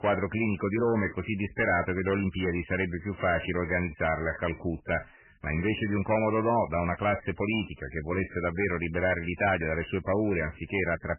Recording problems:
garbled, watery; badly; nothing above 3 kHz
distortion; slight; 5% of the sound clipped

